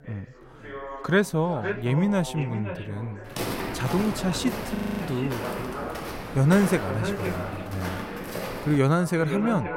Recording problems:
echo of what is said; strong; throughout; 510 ms later, 10 dB below the speech
background chatter; noticeable; throughout; 3 voices, 15 dB below the speech
footsteps; noticeable; from 3.5 to 9 s; peak 4 dB below the speech
audio freezing; at 5 s

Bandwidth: 16 kHz